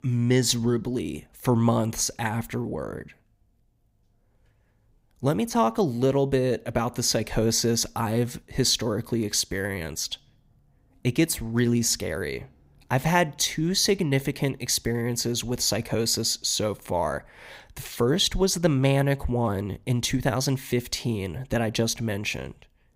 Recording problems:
none

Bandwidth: 15.5 kHz